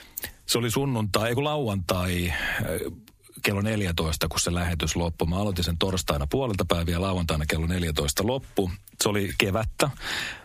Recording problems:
squashed, flat; heavily

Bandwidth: 15 kHz